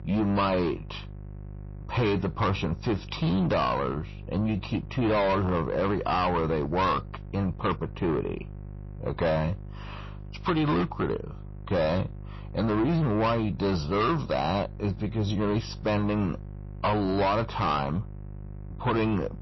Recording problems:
distortion; heavy; 8 dB below the speech
garbled, watery; slightly; nothing above 5.5 kHz
electrical hum; faint; throughout; 50 Hz, 25 dB below the speech

